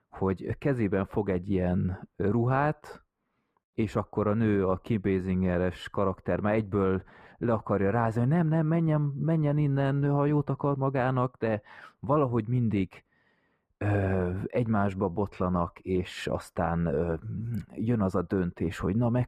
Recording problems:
muffled; very; fading above 3 kHz

